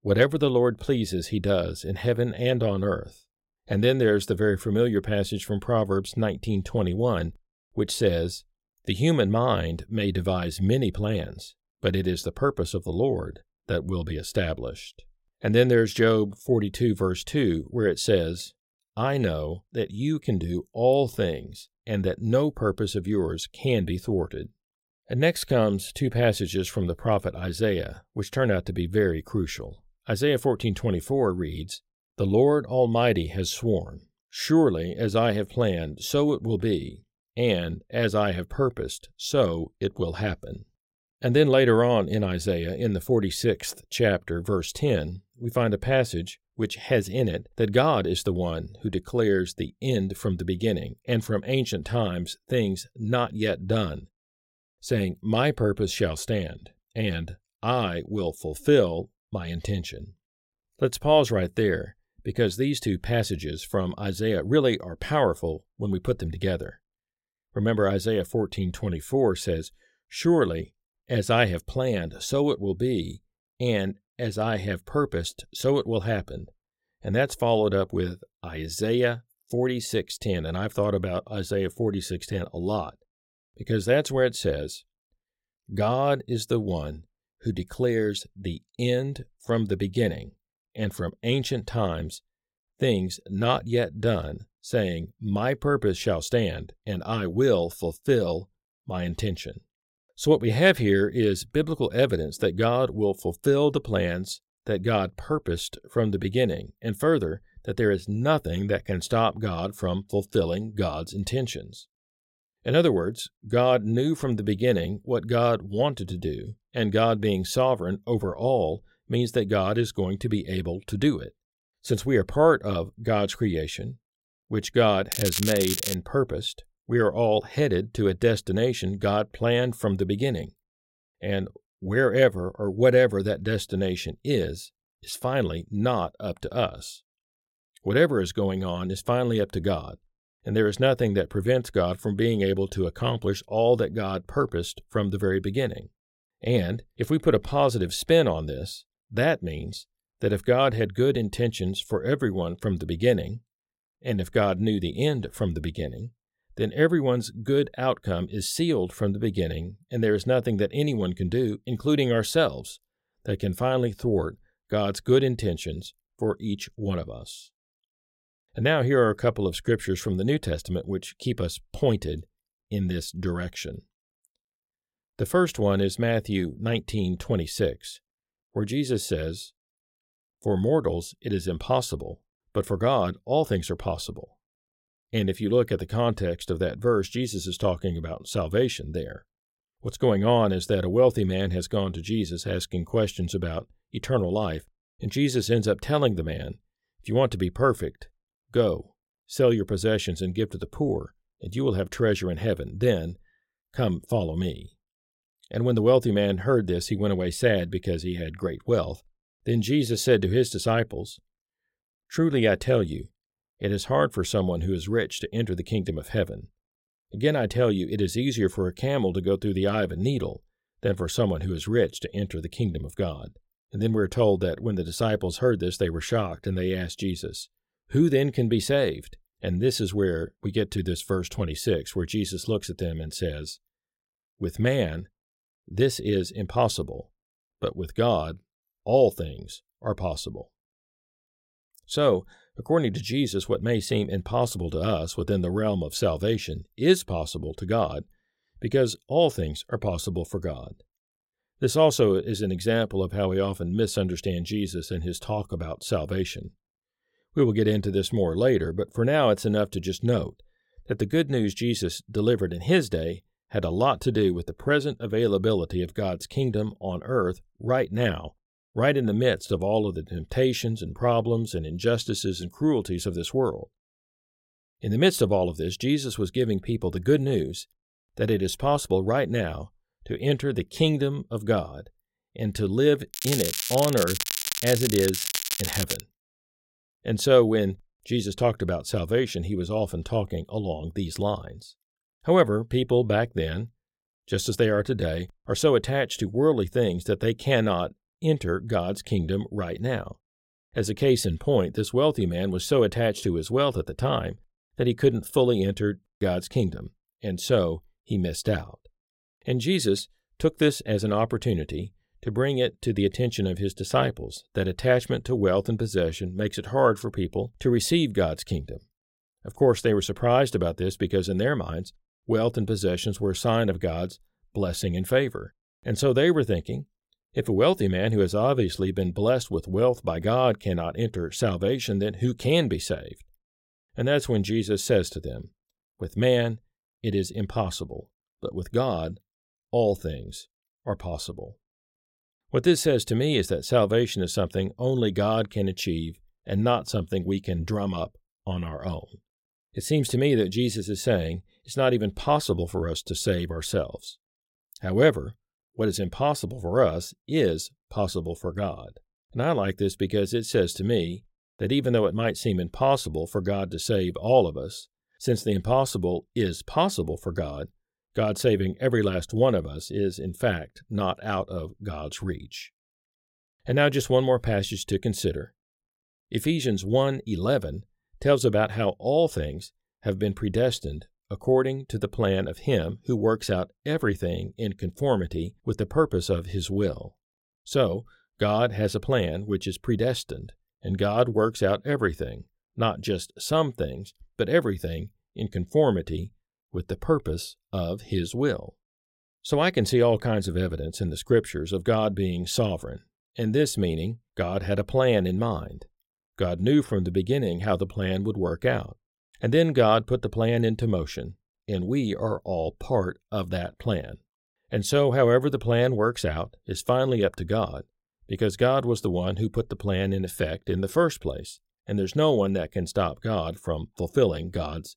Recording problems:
crackling; loud; at 2:05 and from 4:43 to 4:46; 3 dB below the speech

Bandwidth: 16 kHz